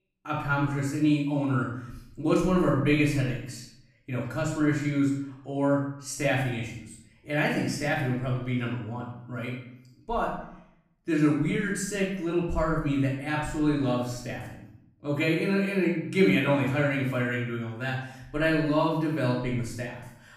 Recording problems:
off-mic speech; far
room echo; noticeable; dies away in 0.7 s

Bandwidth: 15 kHz